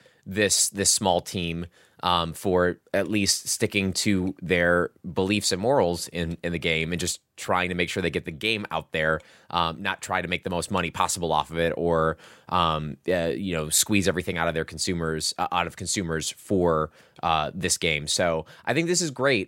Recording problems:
none

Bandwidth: 16 kHz